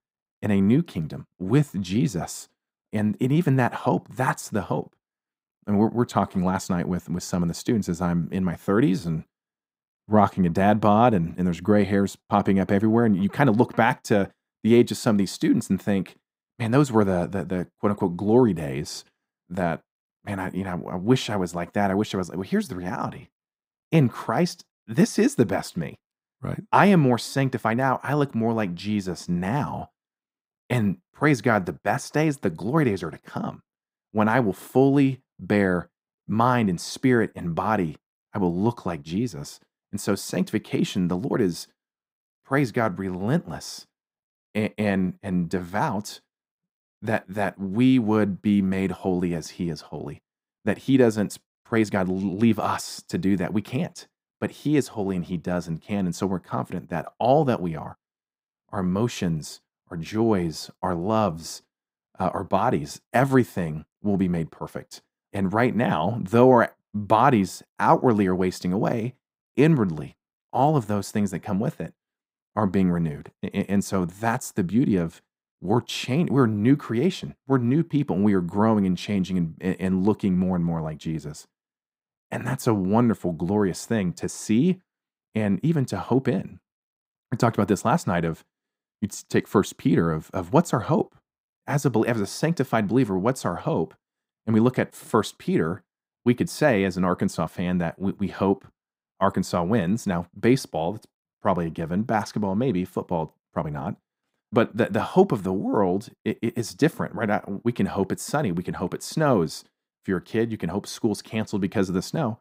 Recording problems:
muffled; very; fading above 2.5 kHz
uneven, jittery; slightly; from 23 to 52 s

